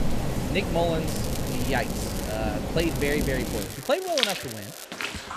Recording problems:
echo of what is said; faint; throughout; 450 ms later, 20 dB below the speech
rain or running water; loud; throughout; 1 dB below the speech
crackling; loud; from 1 to 2.5 s and from 3 to 5 s; 10 dB below the speech

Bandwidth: 14.5 kHz